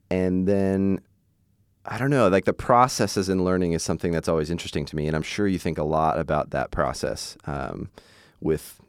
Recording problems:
none

